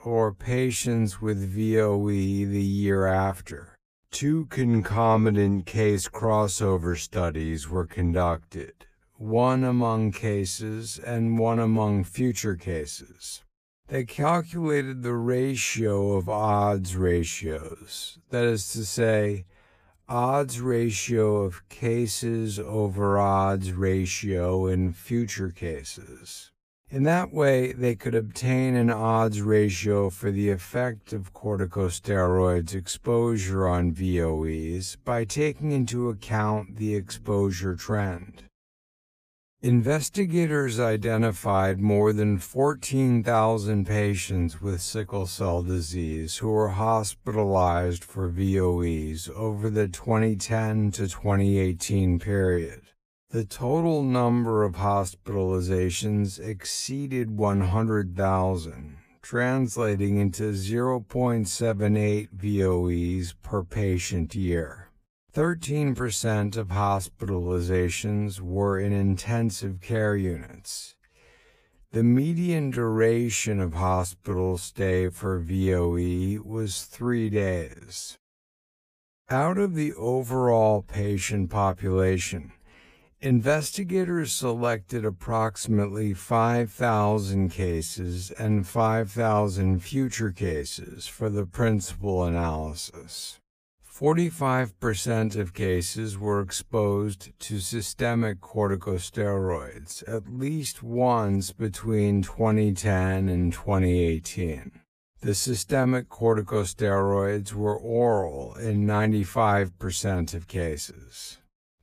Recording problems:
wrong speed, natural pitch; too slow; 0.6 times normal speed

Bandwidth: 15 kHz